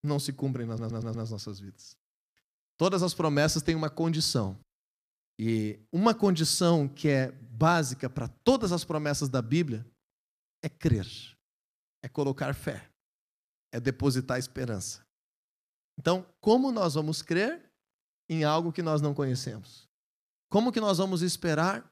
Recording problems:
audio stuttering; at 0.5 s

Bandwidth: 14.5 kHz